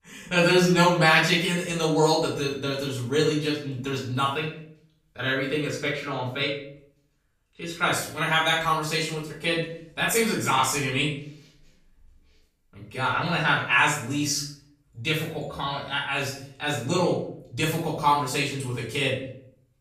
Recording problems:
off-mic speech; far
room echo; noticeable; dies away in 0.5 s

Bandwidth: 14.5 kHz